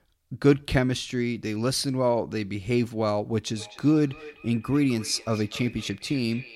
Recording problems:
echo of what is said; noticeable; from 3.5 s on; 250 ms later, 20 dB below the speech

